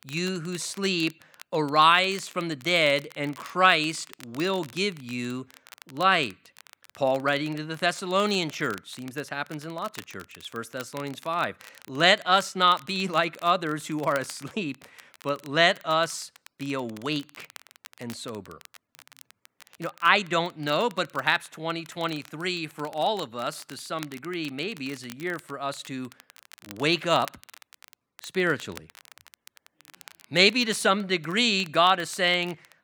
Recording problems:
crackle, like an old record; faint; 25 dB below the speech

